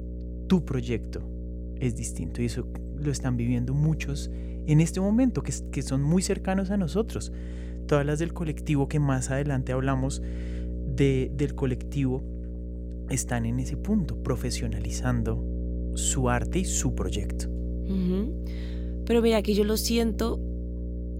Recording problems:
electrical hum; noticeable; throughout; 60 Hz, 15 dB below the speech

